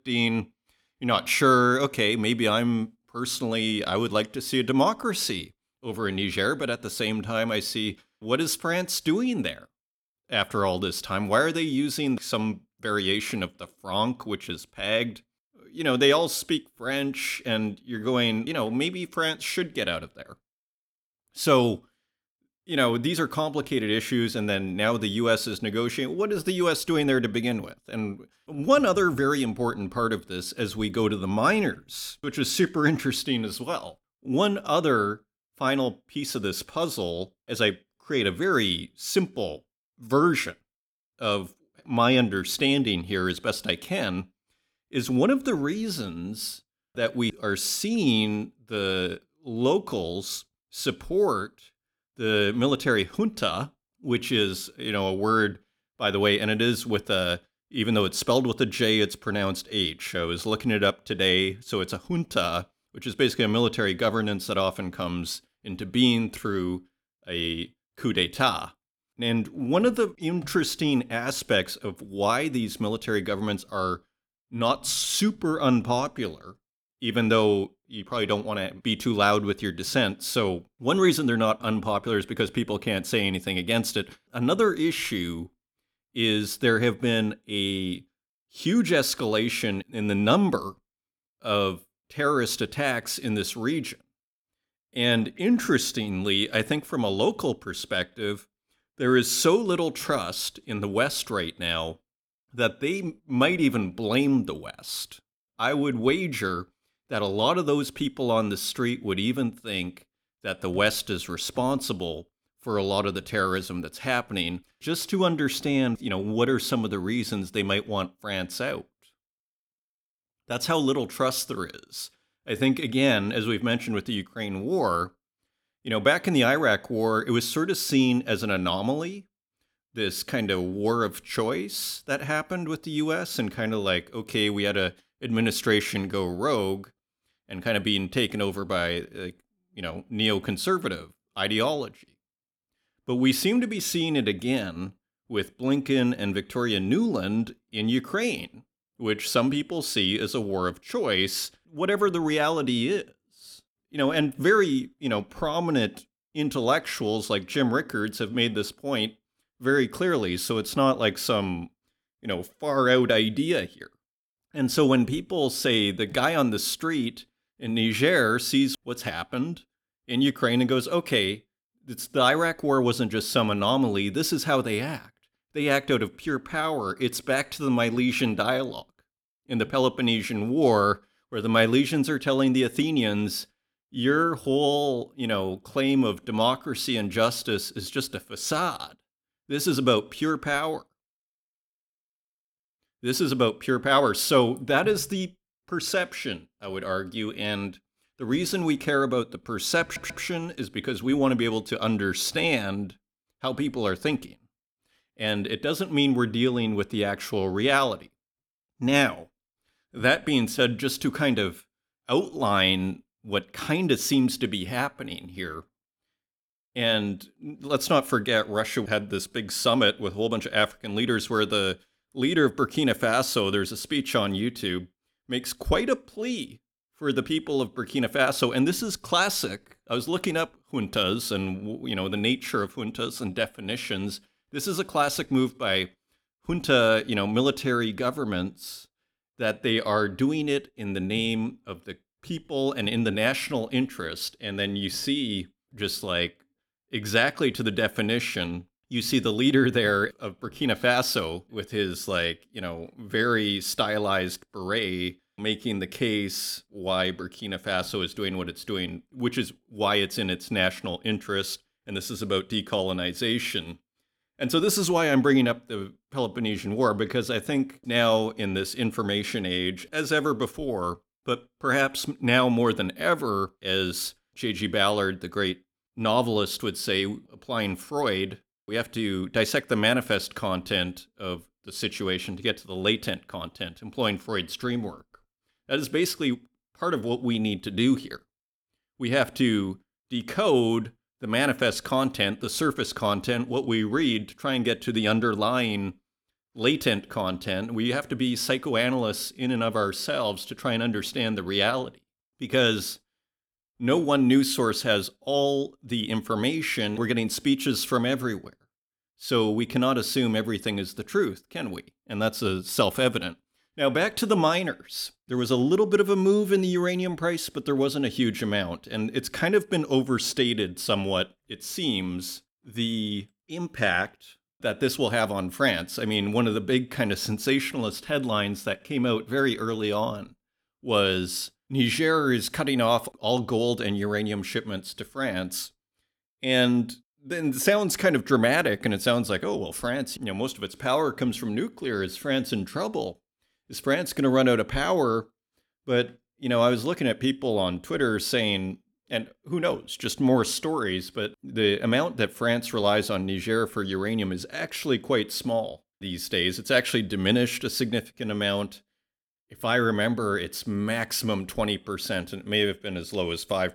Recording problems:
audio stuttering; at 3:20

